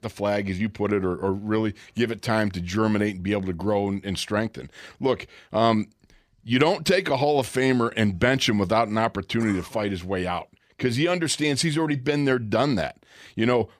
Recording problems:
none

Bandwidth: 15 kHz